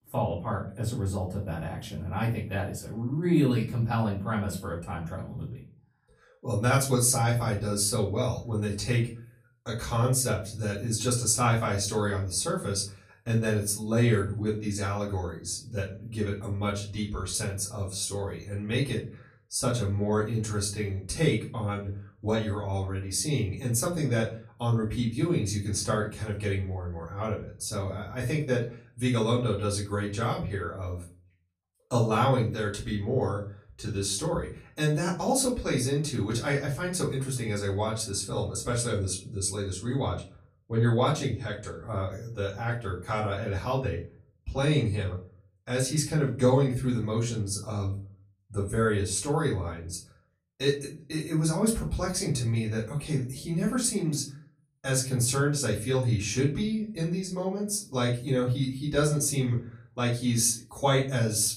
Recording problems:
off-mic speech; far
room echo; slight; dies away in 0.3 s

